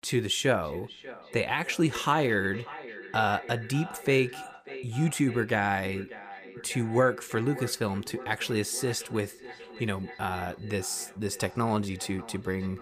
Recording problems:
echo of what is said; noticeable; throughout; 590 ms later, 15 dB below the speech

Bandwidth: 15 kHz